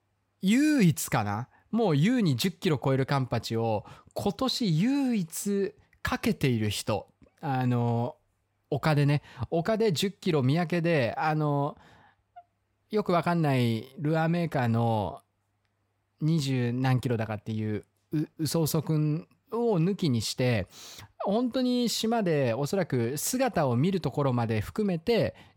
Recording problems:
none

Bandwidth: 17 kHz